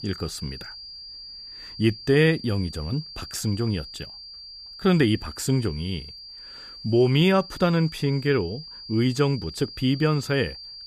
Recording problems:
high-pitched whine; noticeable; throughout; 4.5 kHz, 15 dB below the speech

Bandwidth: 14.5 kHz